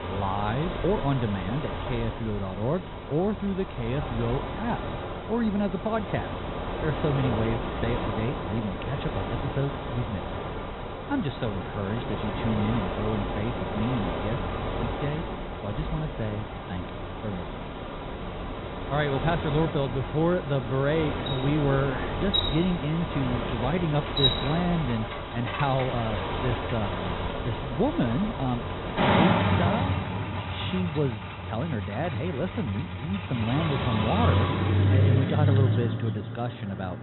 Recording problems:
high frequencies cut off; severe; nothing above 4 kHz
traffic noise; loud; throughout; 1 dB below the speech

